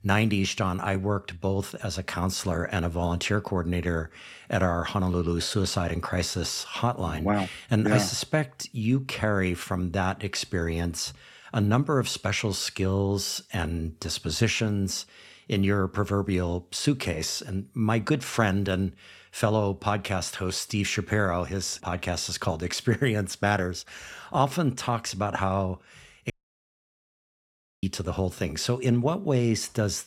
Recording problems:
audio cutting out; at 26 s for 1.5 s

